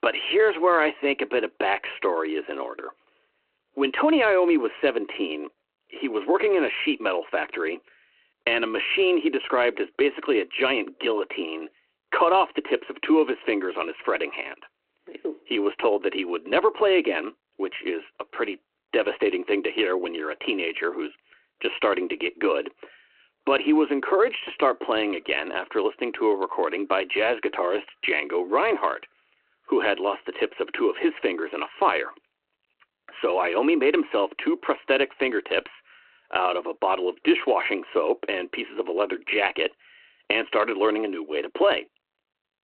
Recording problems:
phone-call audio

